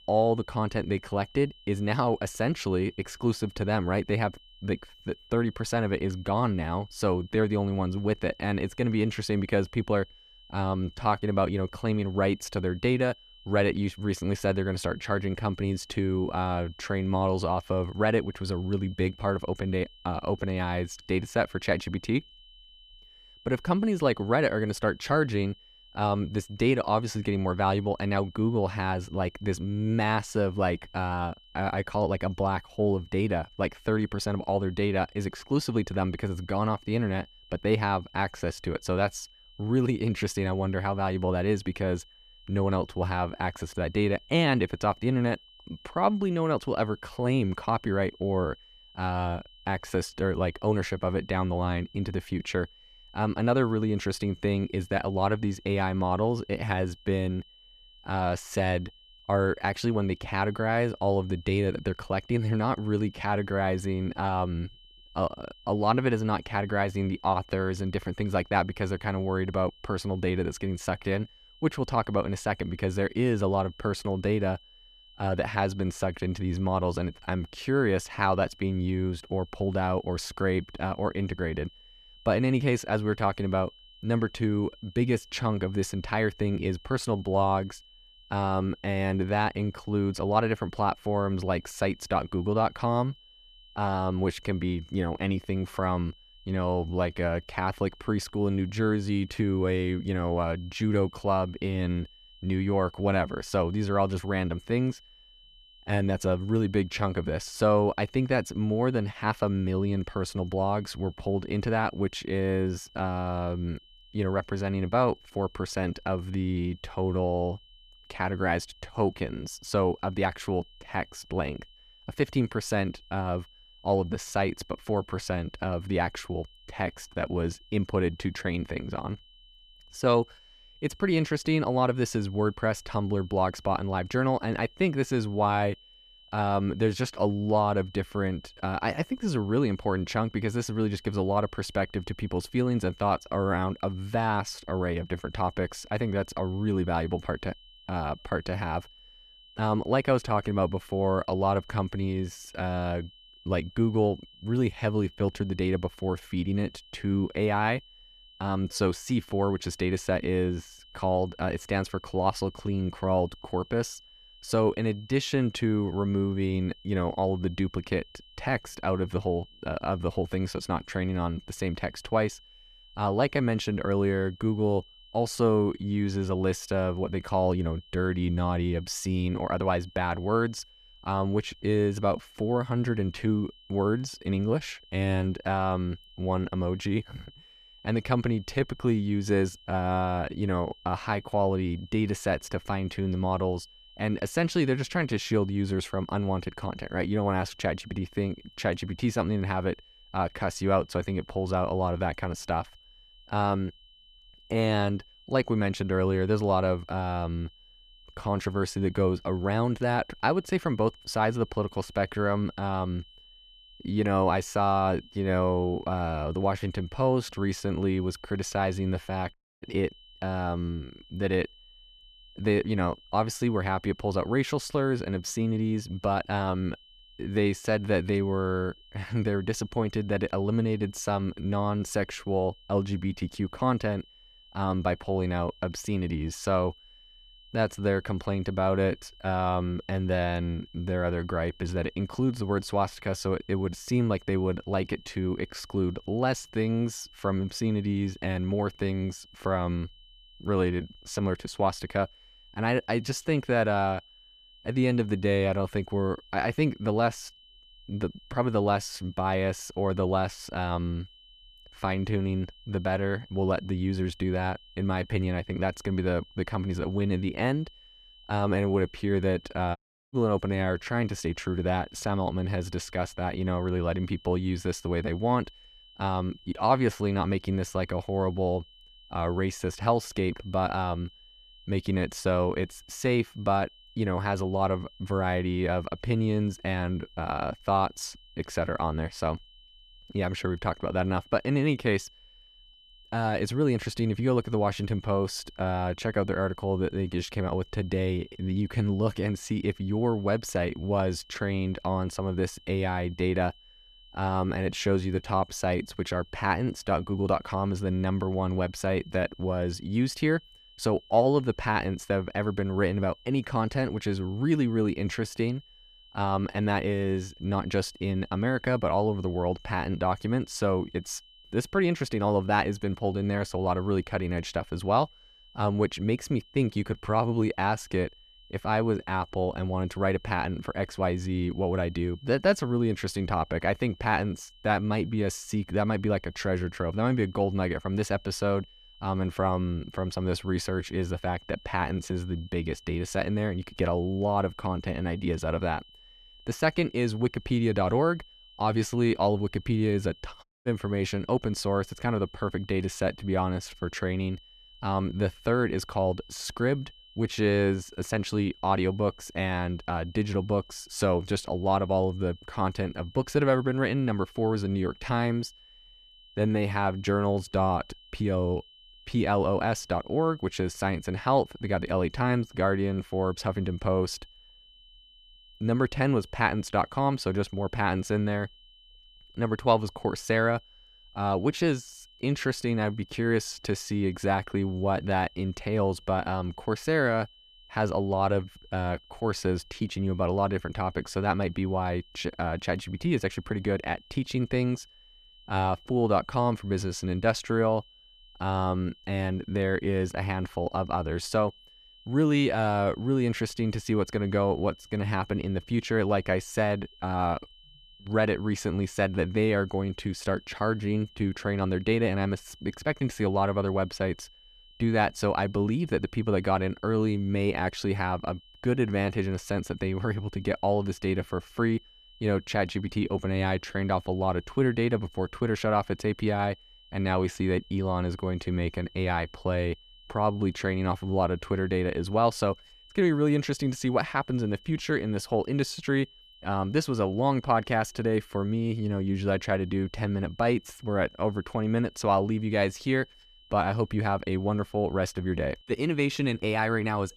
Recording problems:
high-pitched whine; faint; throughout; 3 kHz, 25 dB below the speech
audio cutting out; at 3:39, at 4:30 and at 5:50

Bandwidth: 14.5 kHz